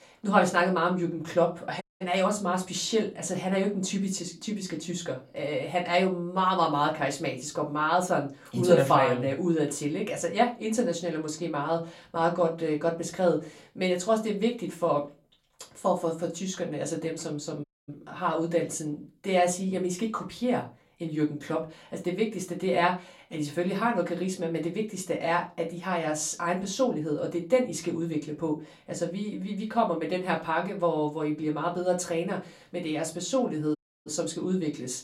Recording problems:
off-mic speech; far
room echo; very slight; dies away in 0.2 s
audio cutting out; at 2 s, at 18 s and at 34 s

